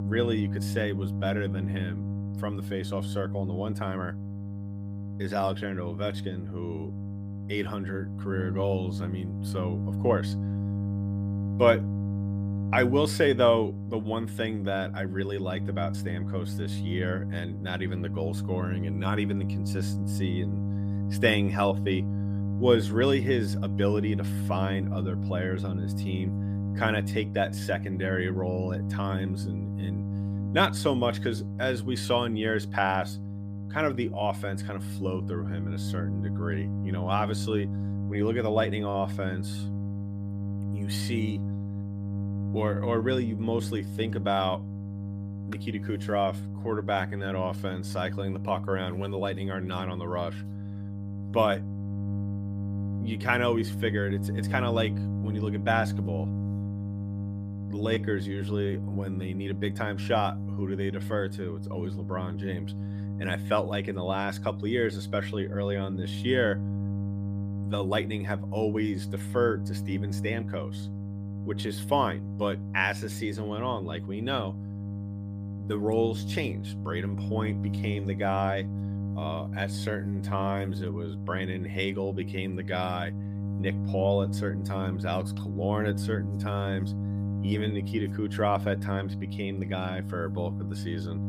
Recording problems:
electrical hum; noticeable; throughout; 50 Hz, 10 dB below the speech

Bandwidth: 15 kHz